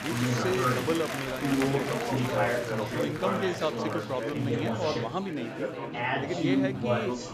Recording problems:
chatter from many people; very loud; throughout; 3 dB above the speech

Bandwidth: 14.5 kHz